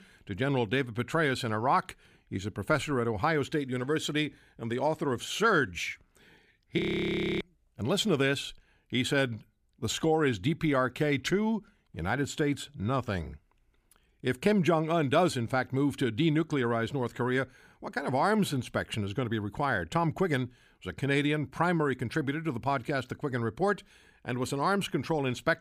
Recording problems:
audio freezing; at 7 s for 0.5 s

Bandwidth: 15 kHz